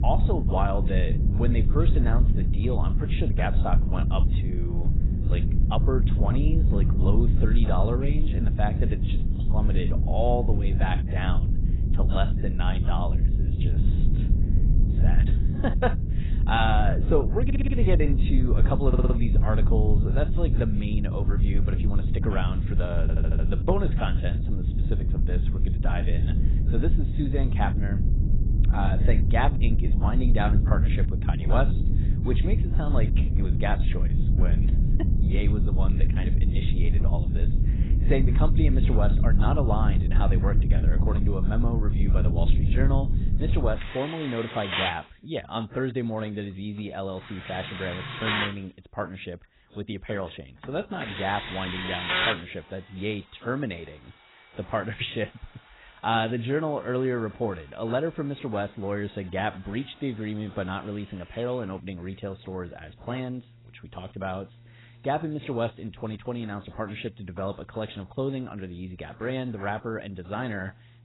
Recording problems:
garbled, watery; badly; nothing above 4 kHz
machinery noise; loud; throughout; 1 dB below the speech
low rumble; loud; until 44 s; 7 dB below the speech
audio stuttering; at 17 s, at 19 s and at 23 s

